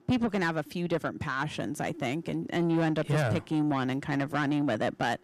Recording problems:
distortion; slight; 10 dB below the speech

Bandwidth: 14.5 kHz